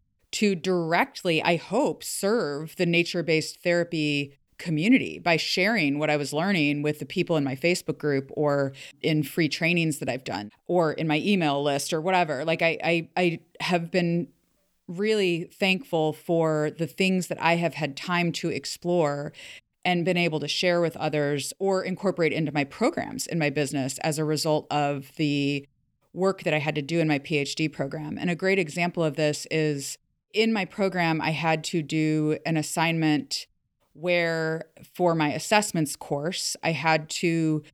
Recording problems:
none

